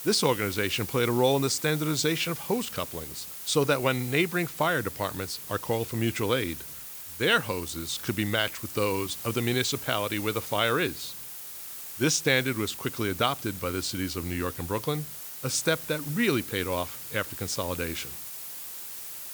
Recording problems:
hiss; loud; throughout; 9 dB below the speech

